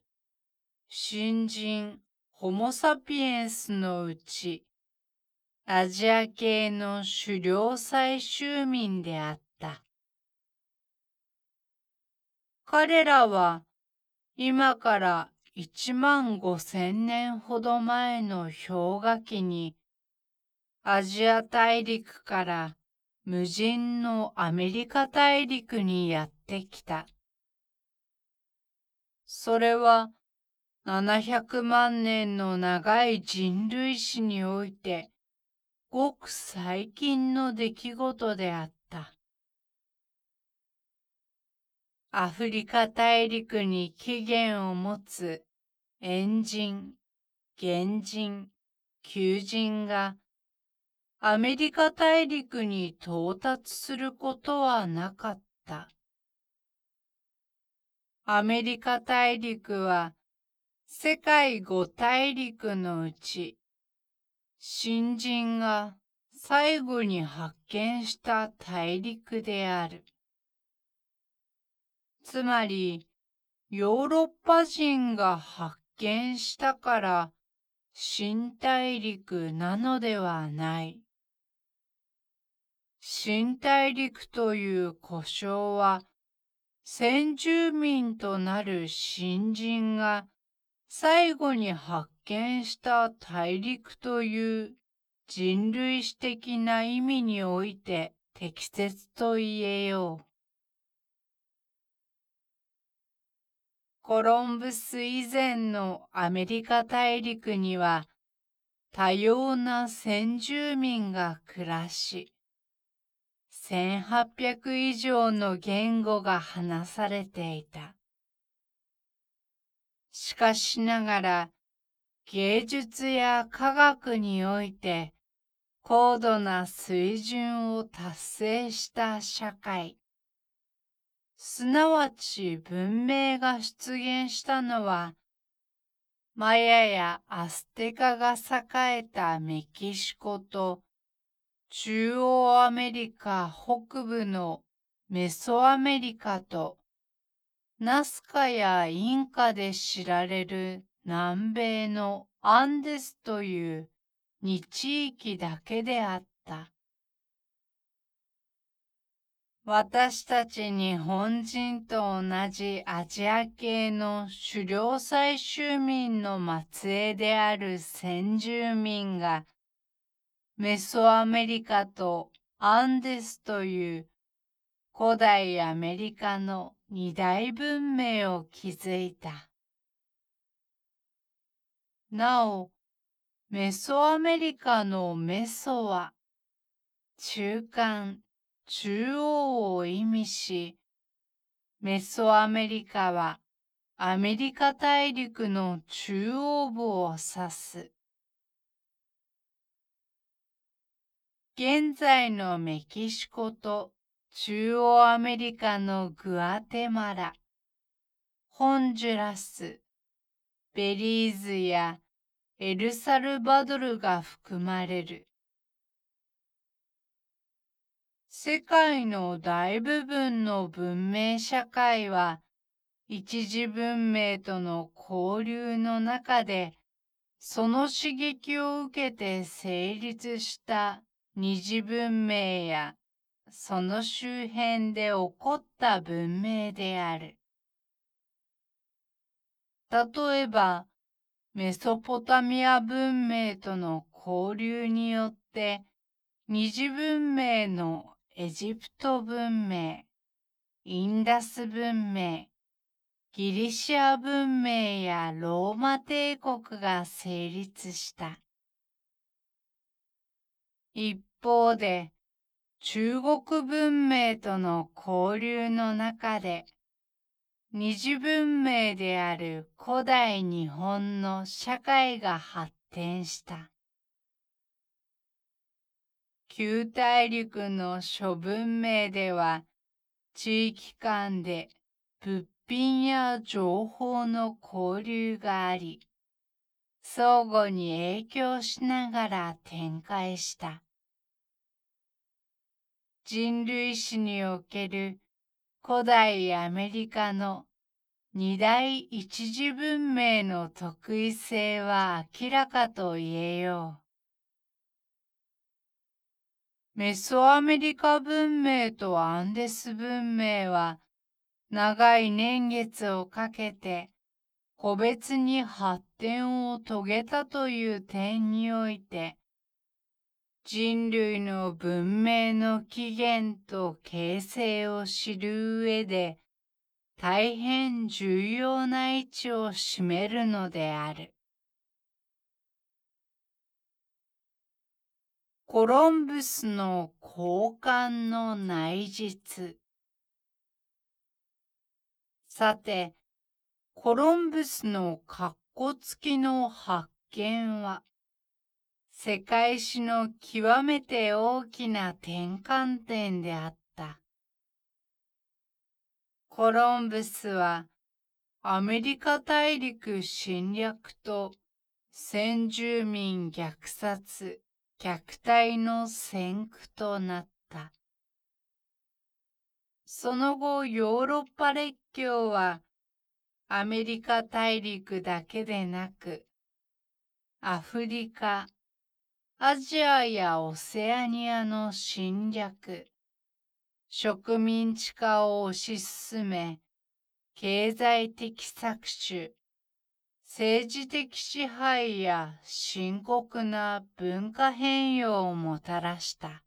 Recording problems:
wrong speed, natural pitch; too slow; 0.6 times normal speed

